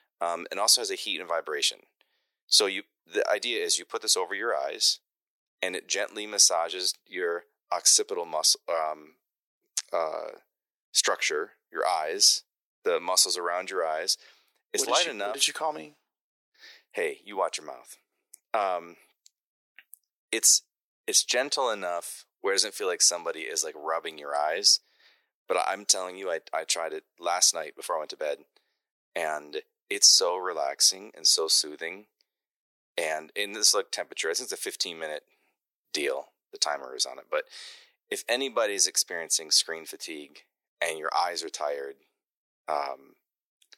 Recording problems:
thin; very; fading below 350 Hz

